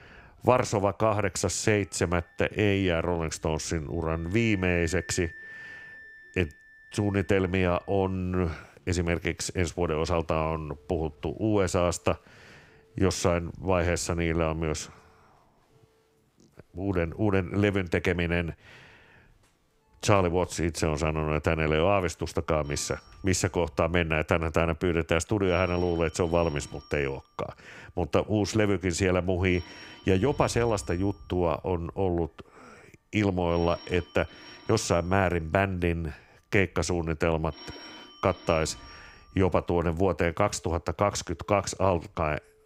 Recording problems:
alarms or sirens; faint; throughout; 25 dB below the speech
background music; faint; throughout; 25 dB below the speech

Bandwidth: 15.5 kHz